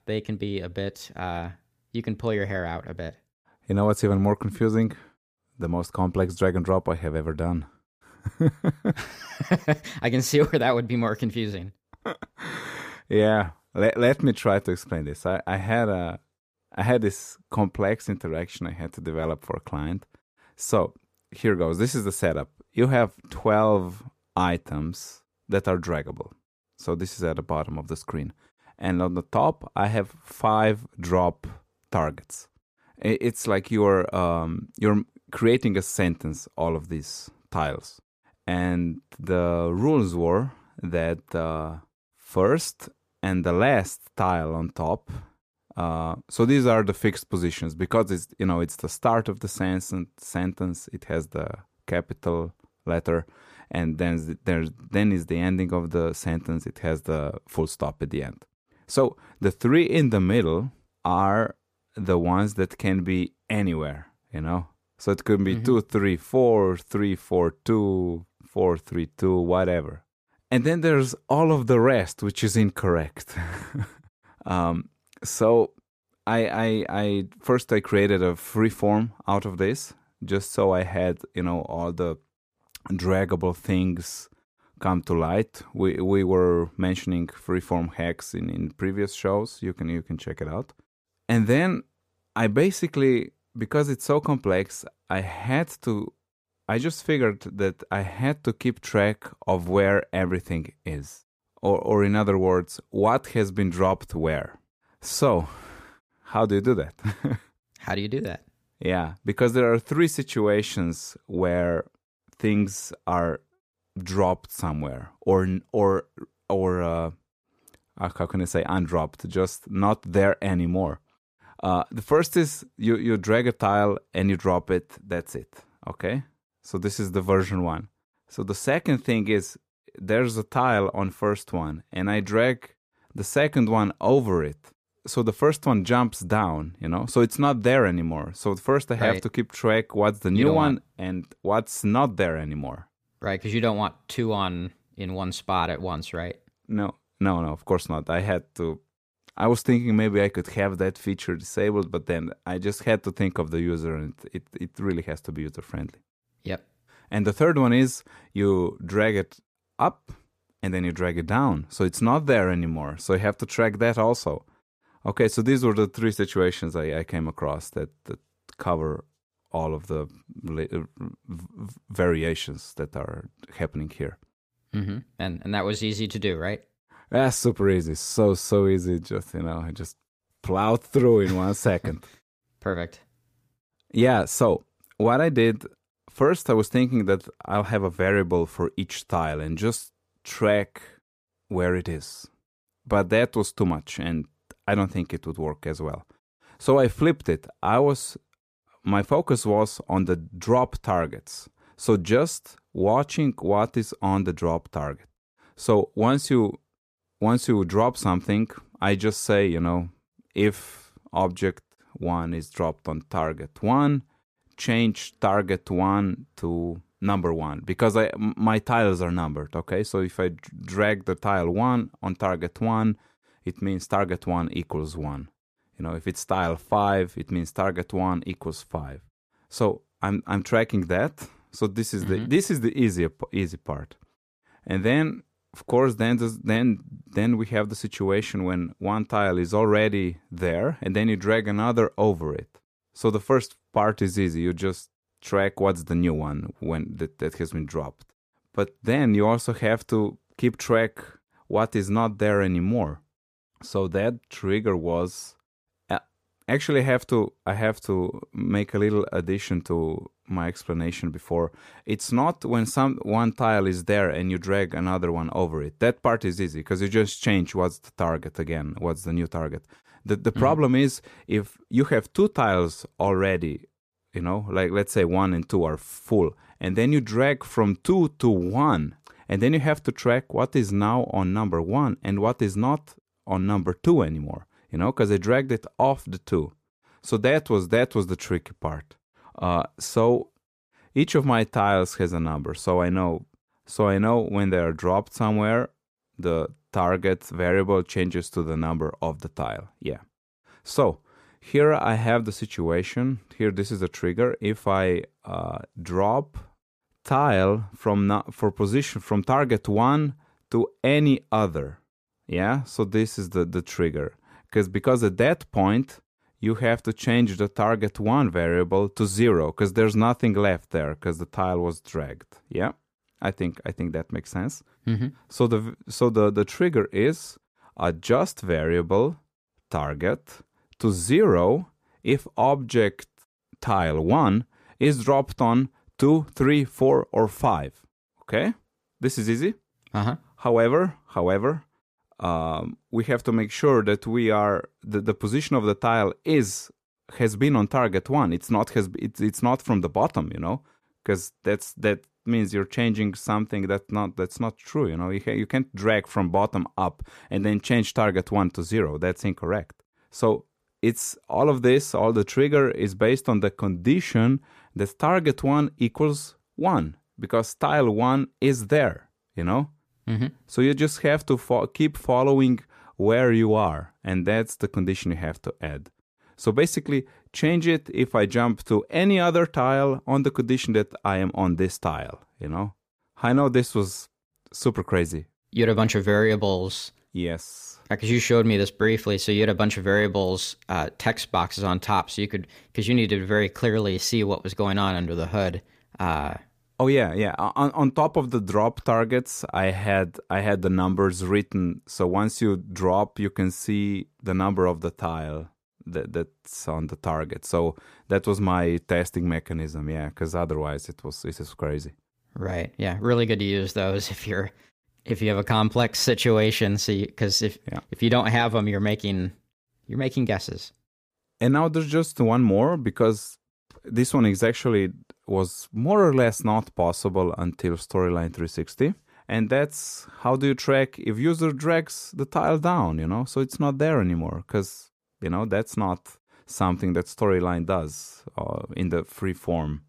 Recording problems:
none

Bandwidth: 15 kHz